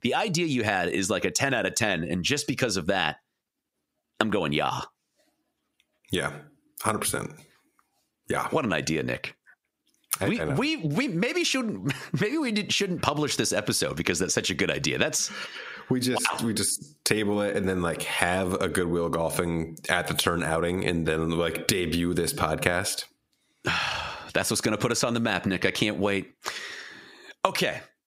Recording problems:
squashed, flat; heavily

